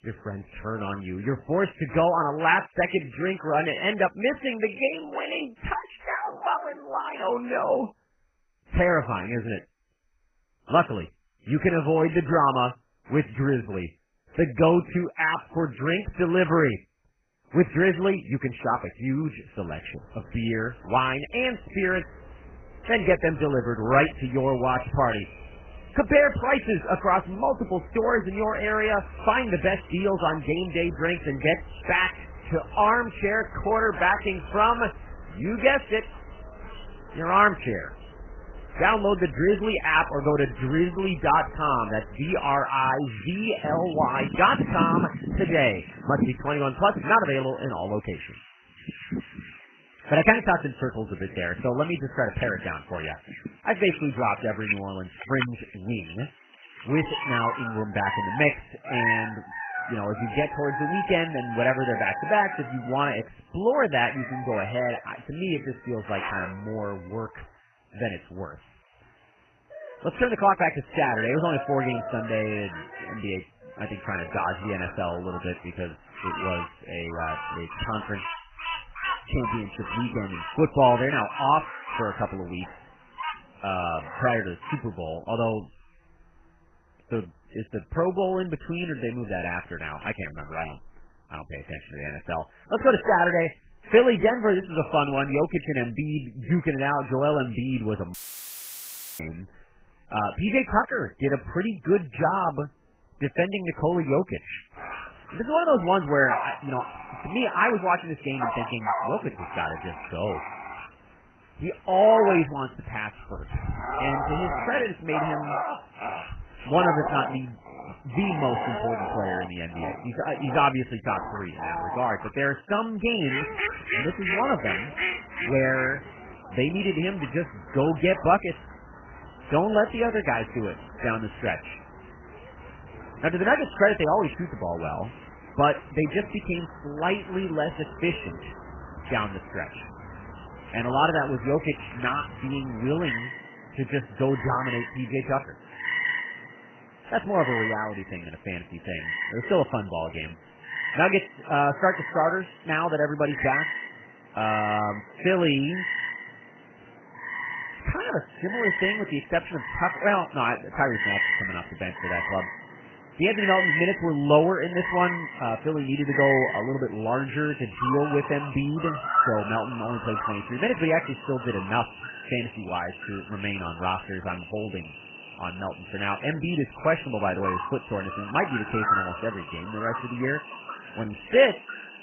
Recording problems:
garbled, watery; badly; nothing above 3 kHz
animal sounds; loud; throughout; 7 dB below the speech
audio cutting out; filled with static; at 1:38 for 1 s

